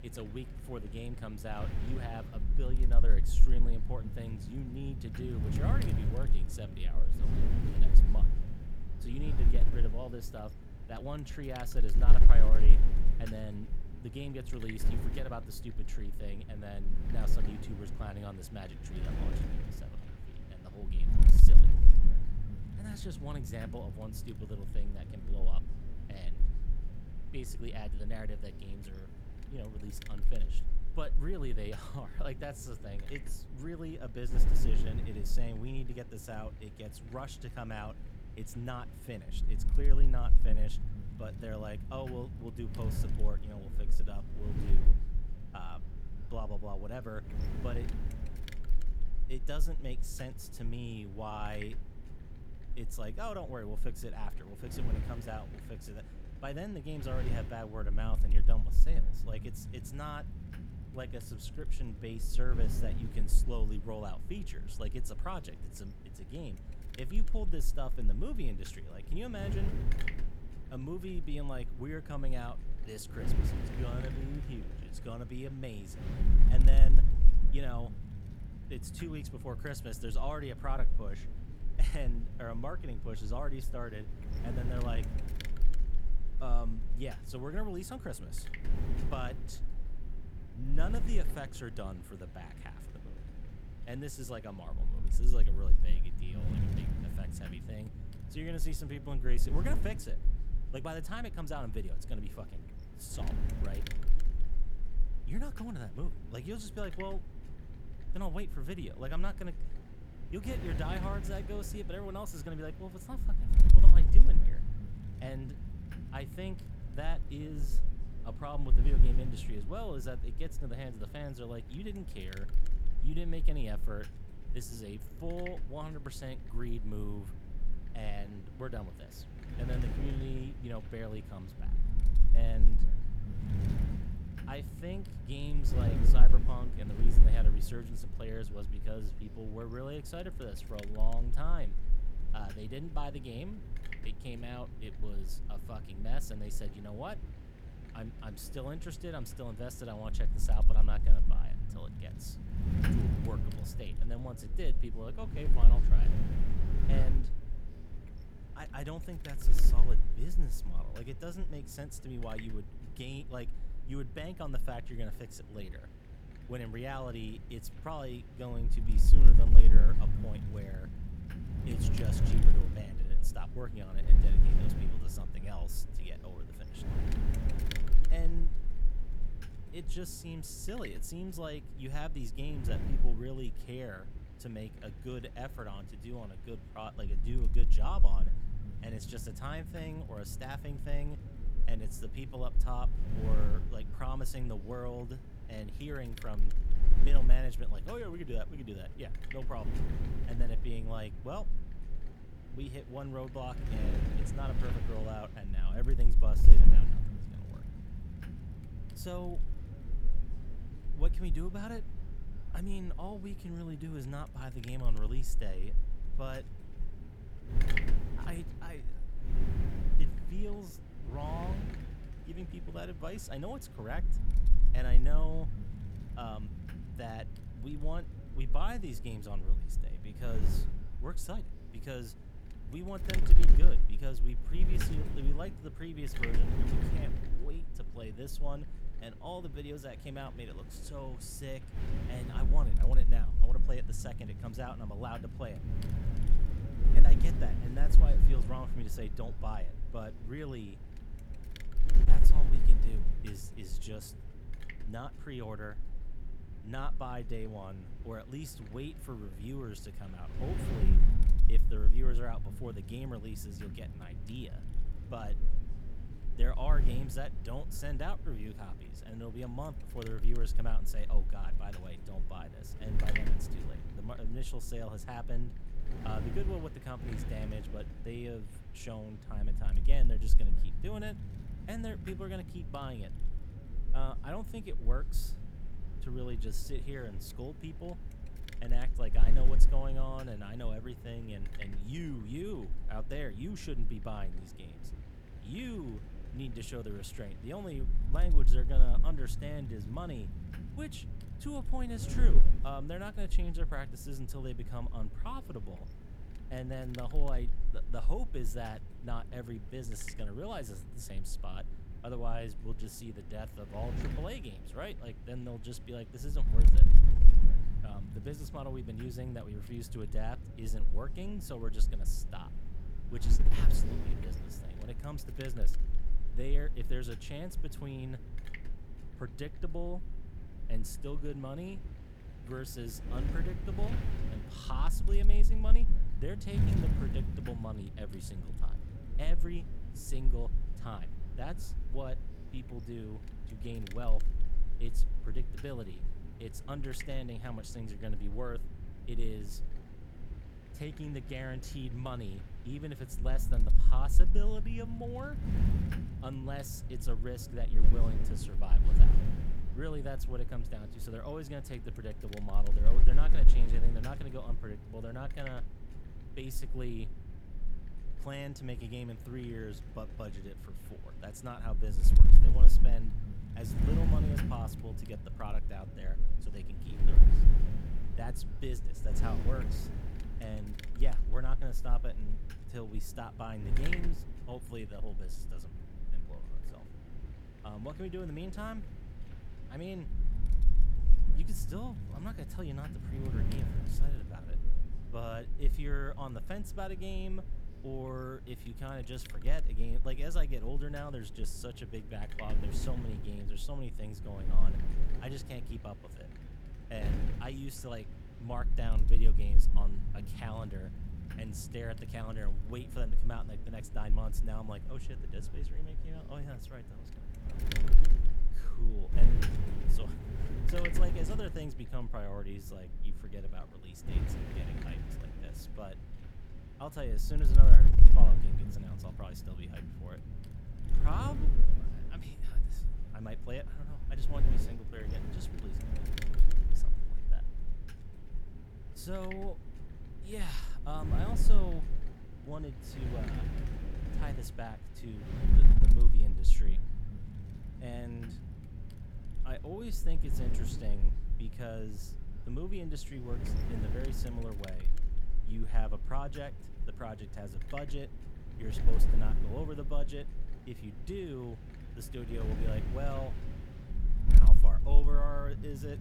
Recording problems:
wind noise on the microphone; heavy; 5 dB below the speech

